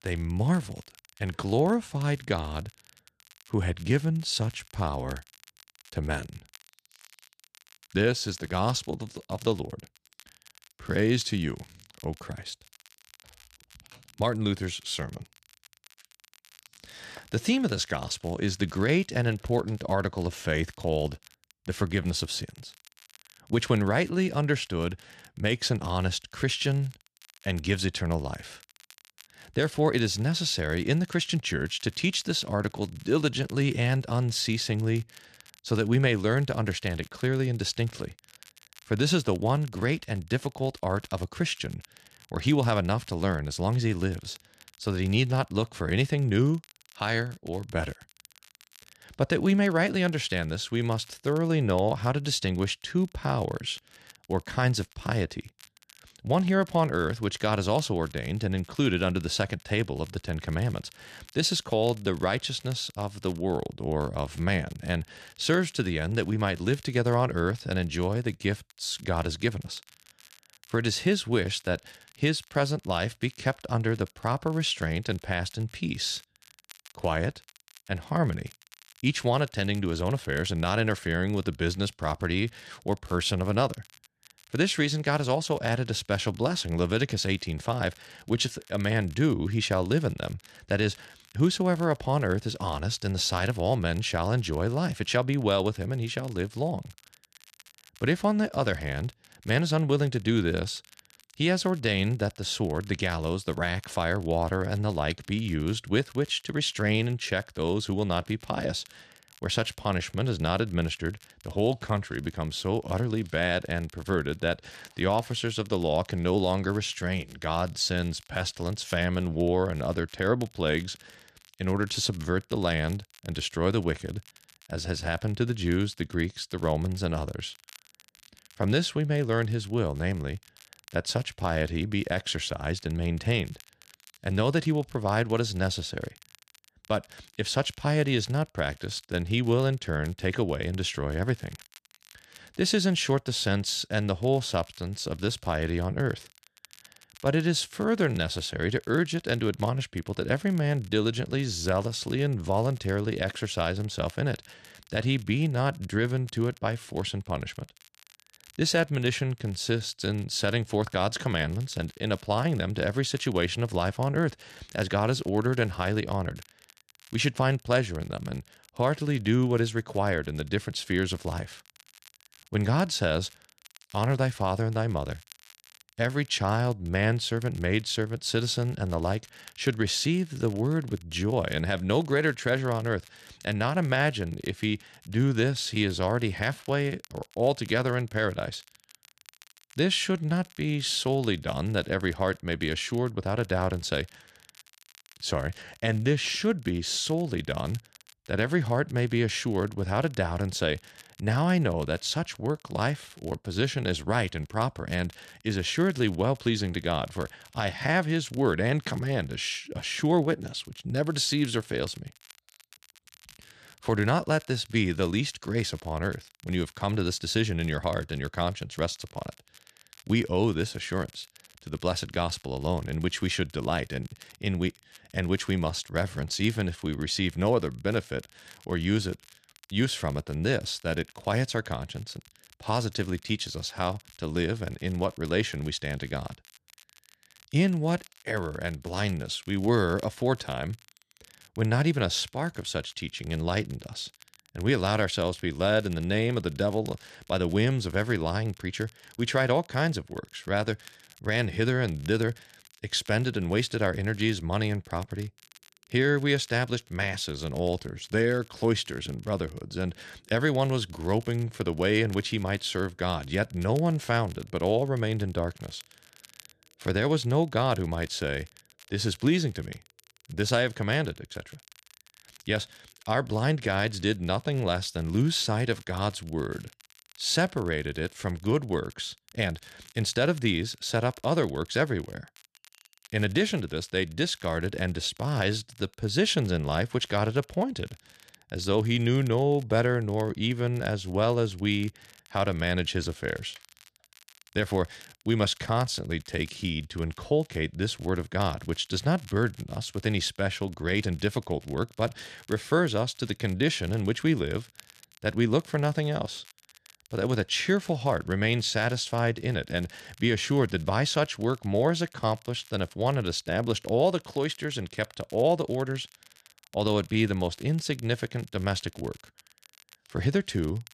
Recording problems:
crackle, like an old record; faint; 25 dB below the speech

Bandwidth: 13.5 kHz